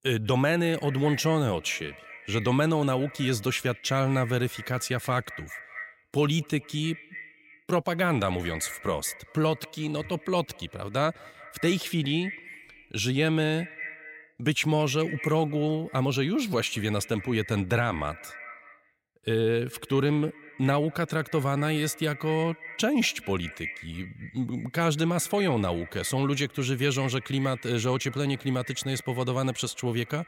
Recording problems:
echo of what is said; noticeable; throughout; 190 ms later, 15 dB below the speech

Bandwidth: 16 kHz